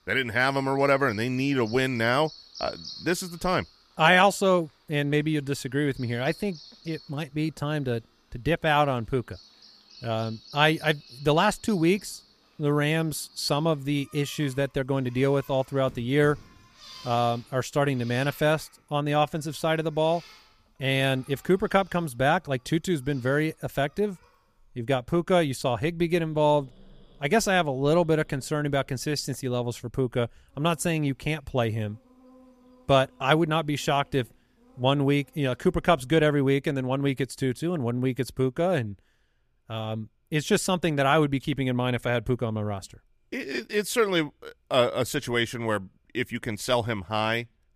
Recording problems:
animal sounds; faint; until 36 s; 20 dB below the speech

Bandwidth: 14.5 kHz